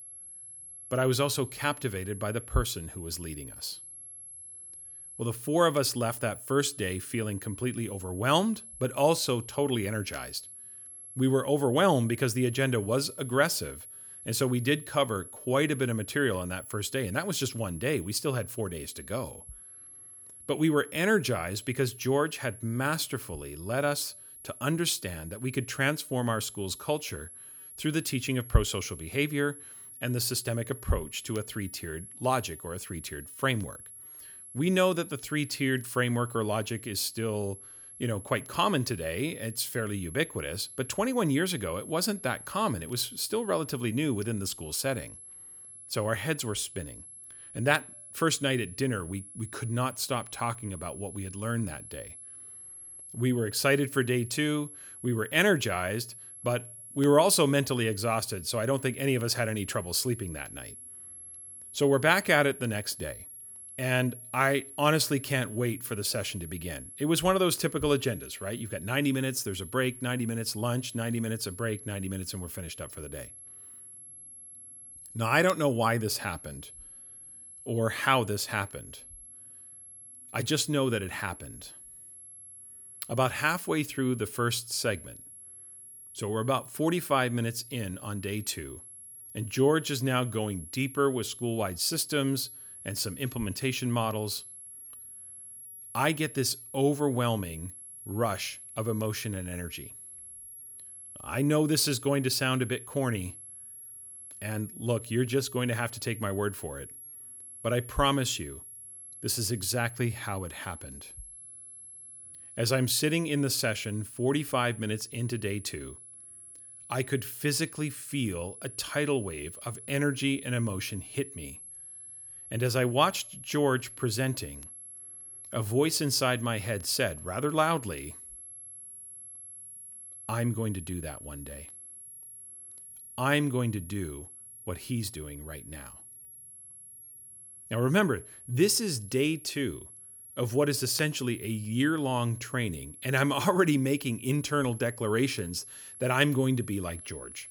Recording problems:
high-pitched whine; noticeable; throughout; 11 kHz, 15 dB below the speech

